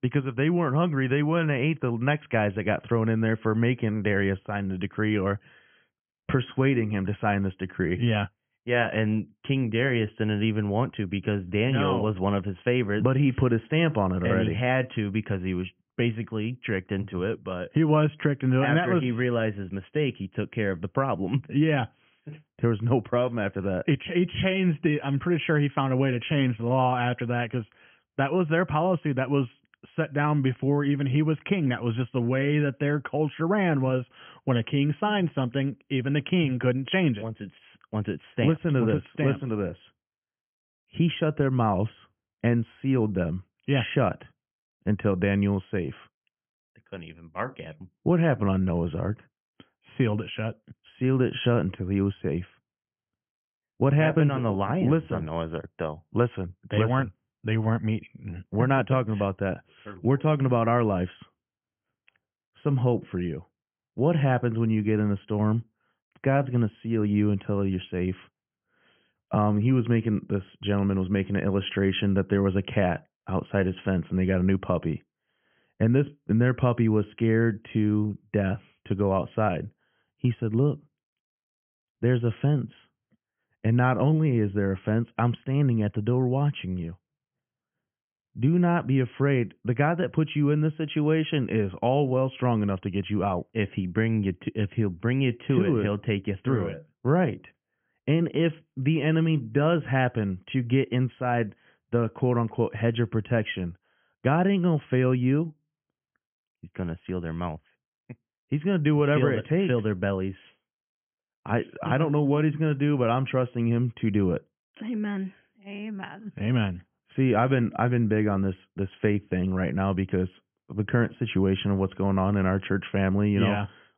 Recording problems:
high frequencies cut off; severe; nothing above 3.5 kHz

